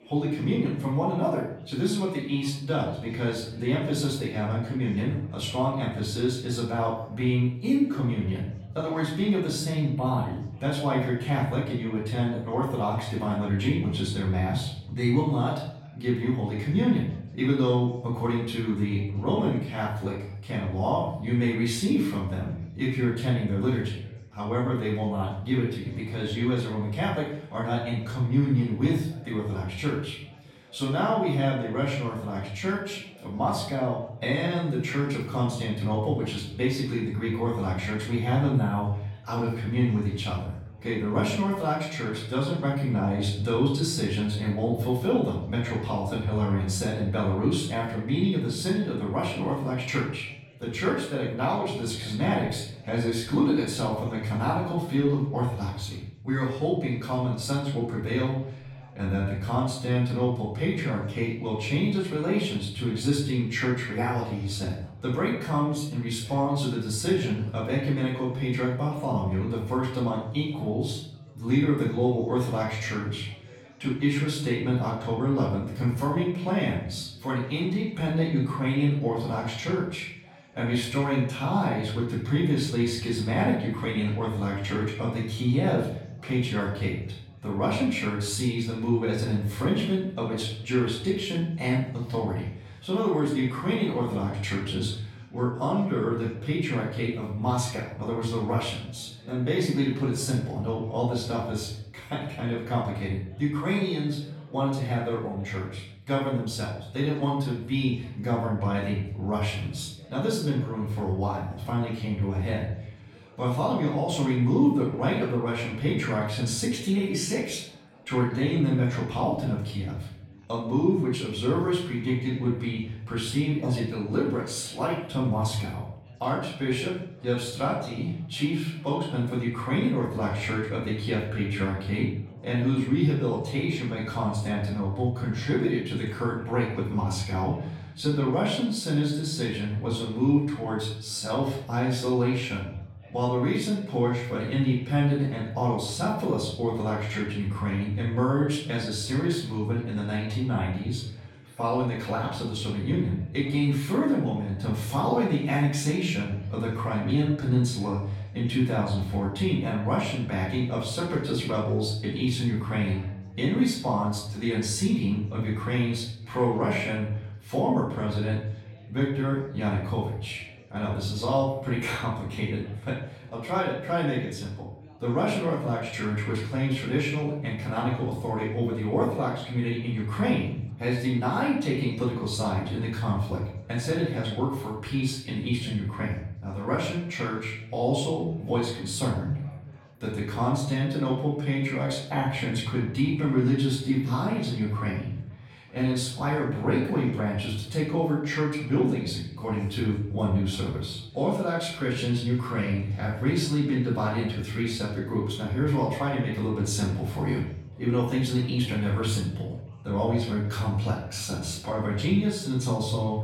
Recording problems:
off-mic speech; far
room echo; noticeable; dies away in 0.6 s
chatter from many people; faint; throughout; 25 dB below the speech

